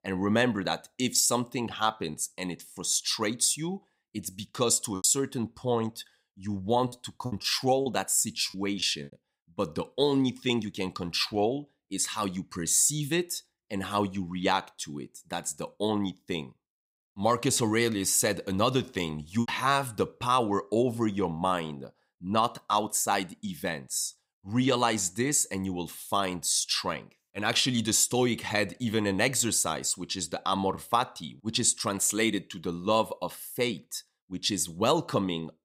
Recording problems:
choppy; very; from 2 to 5 s, from 7 to 9 s and from 18 to 19 s; 6% of the speech affected

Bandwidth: 15.5 kHz